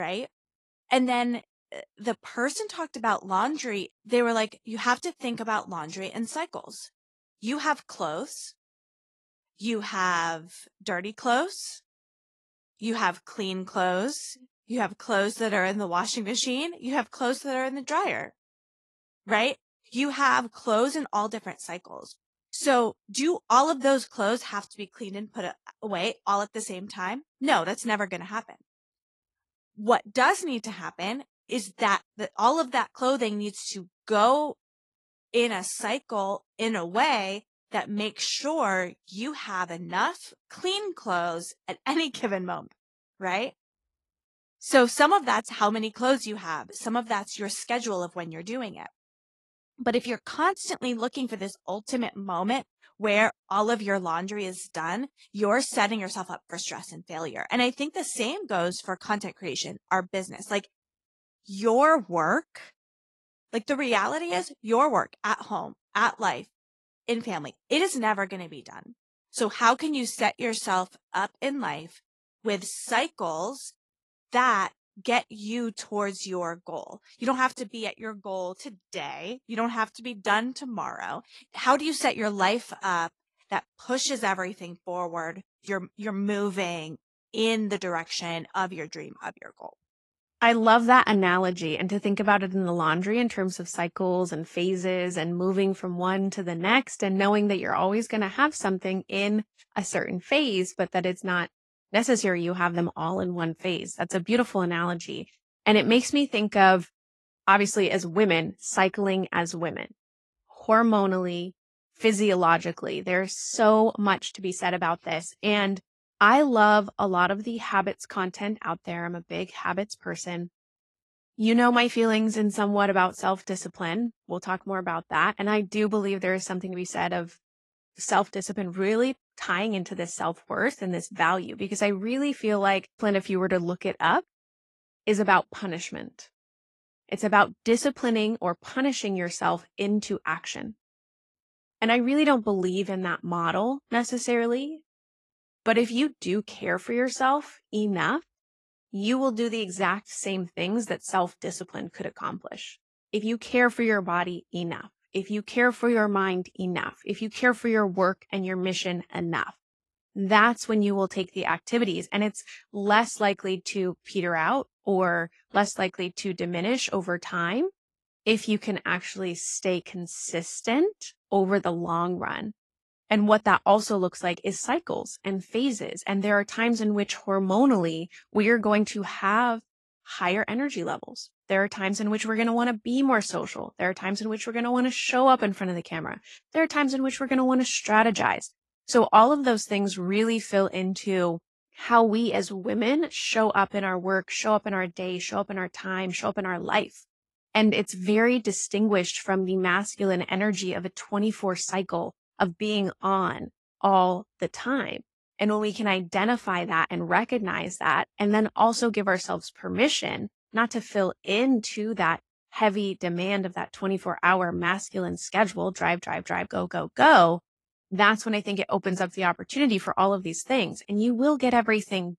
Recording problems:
garbled, watery; slightly; nothing above 11 kHz
abrupt cut into speech; at the start

